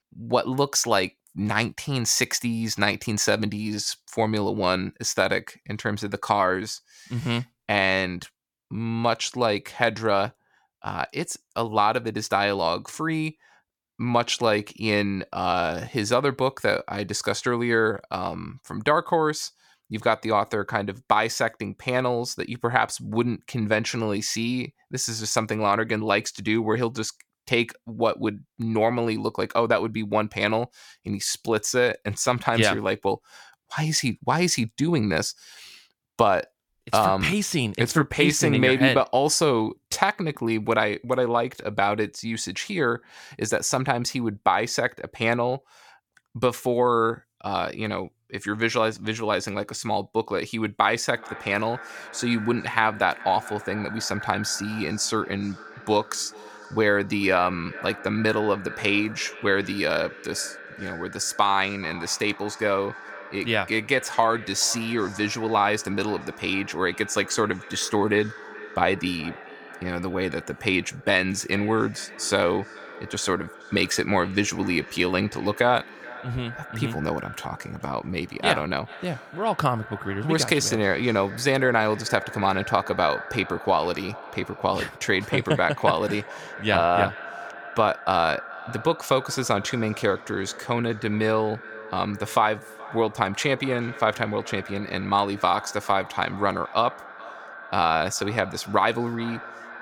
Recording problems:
echo of what is said; noticeable; from 51 s on; 430 ms later, 15 dB below the speech

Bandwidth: 17.5 kHz